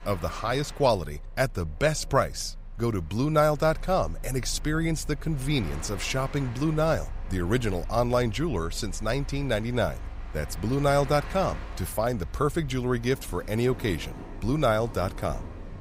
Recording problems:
train or aircraft noise; noticeable; throughout; 15 dB below the speech

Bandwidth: 15.5 kHz